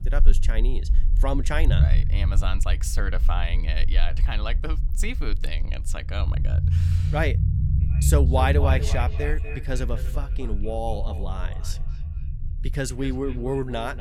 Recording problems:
echo of what is said; strong; from 8 s on; 240 ms later, 10 dB below the speech
low rumble; noticeable; throughout; 10 dB below the speech

